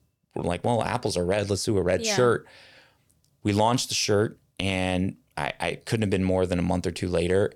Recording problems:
none

